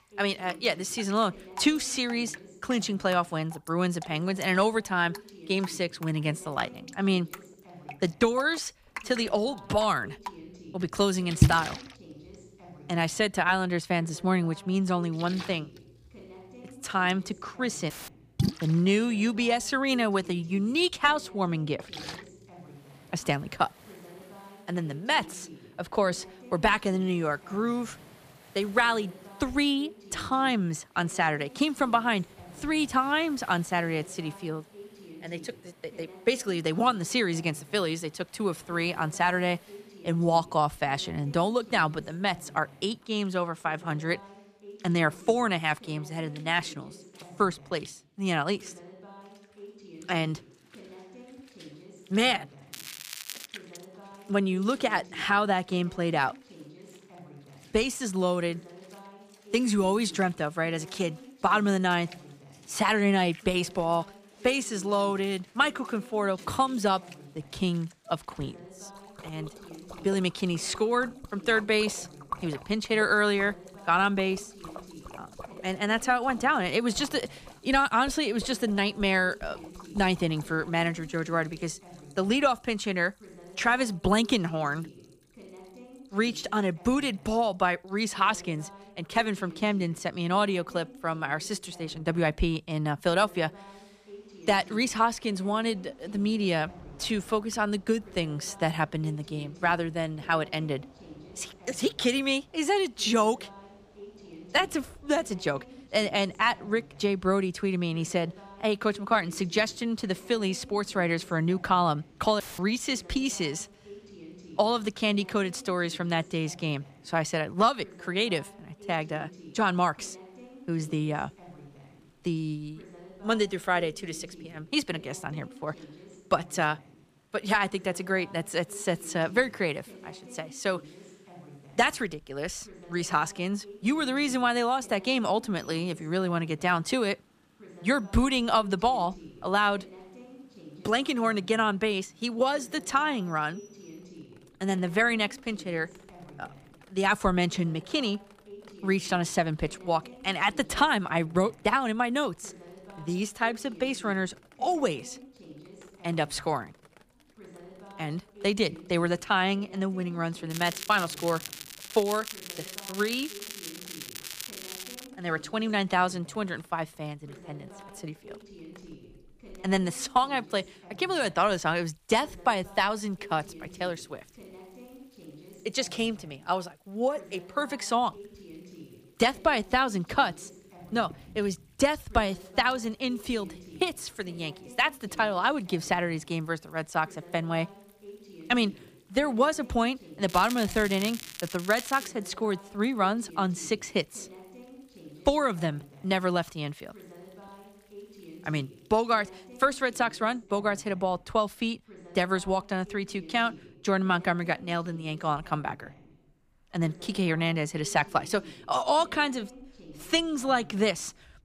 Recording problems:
rain or running water; noticeable; throughout; 15 dB below the speech
crackling; noticeable; at 53 s, from 2:41 to 2:45 and from 3:10 to 3:12; 10 dB below the speech
voice in the background; faint; throughout; 20 dB below the speech
audio cutting out; filled with static; at 18 s and at 1:52

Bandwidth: 15 kHz